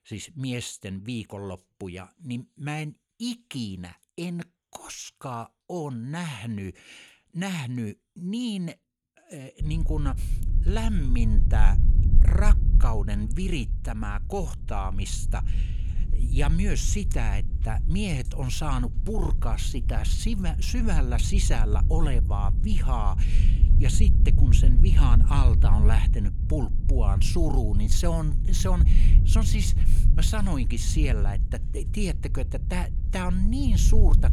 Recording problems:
low rumble; loud; from 9.5 s on; 8 dB below the speech

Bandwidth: 17 kHz